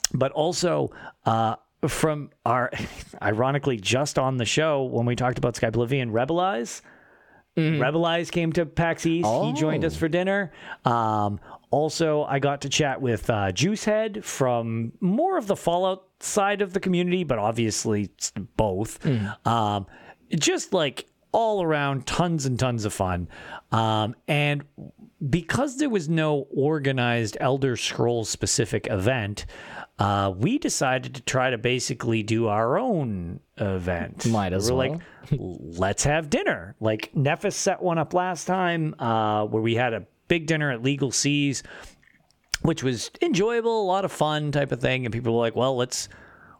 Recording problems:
squashed, flat; somewhat

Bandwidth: 17.5 kHz